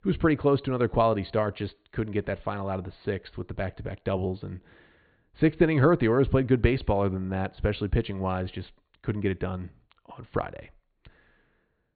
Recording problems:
high frequencies cut off; severe; nothing above 4.5 kHz

